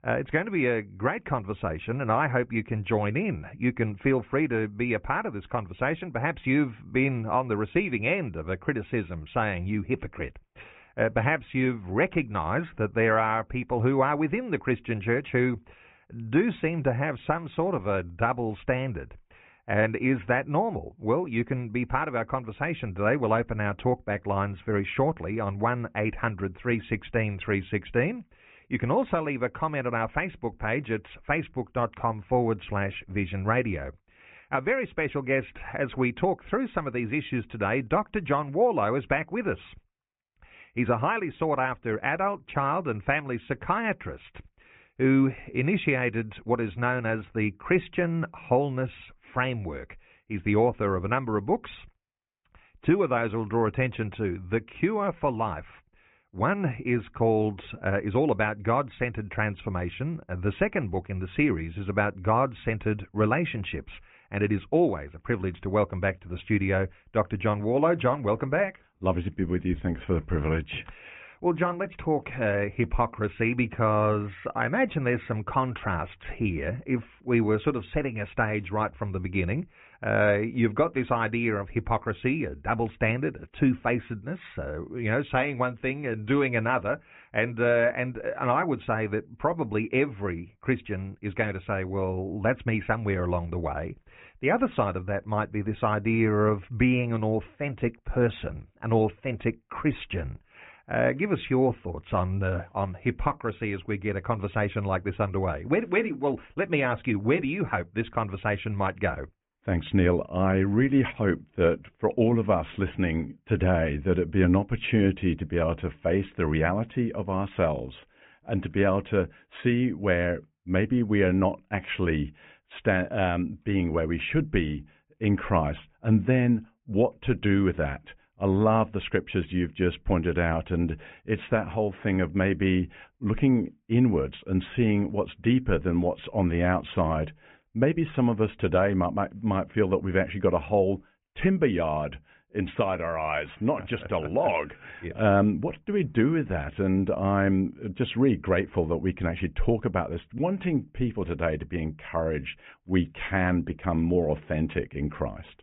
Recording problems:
high frequencies cut off; severe; nothing above 4 kHz
muffled; very slightly; fading above 2.5 kHz

